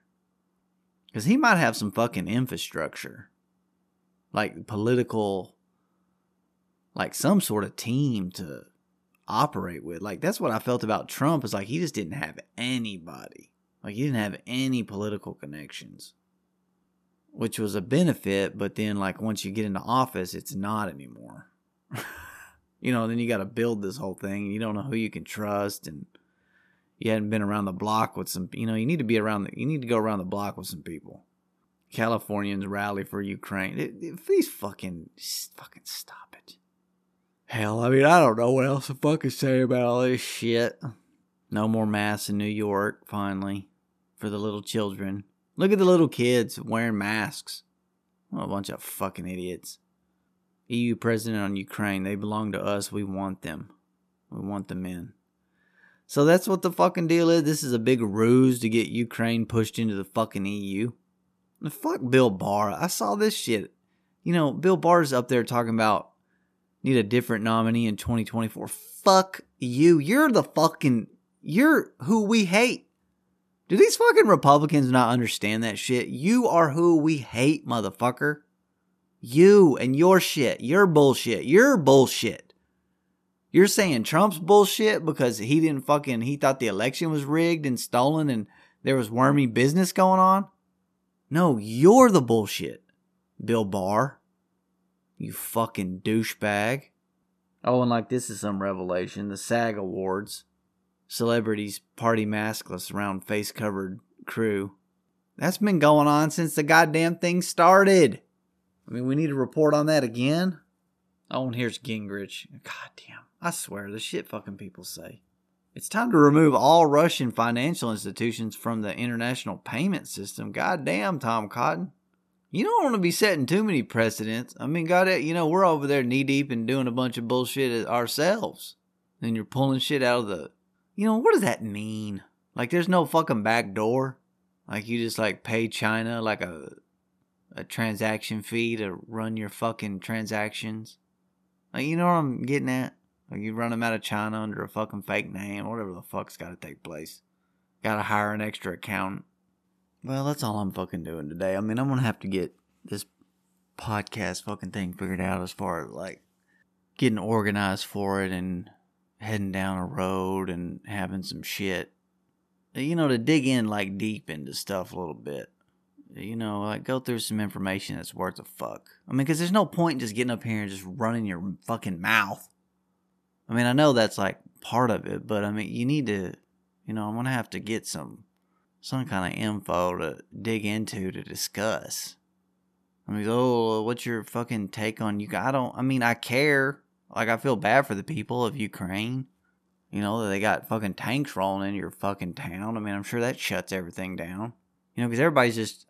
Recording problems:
none

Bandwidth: 14 kHz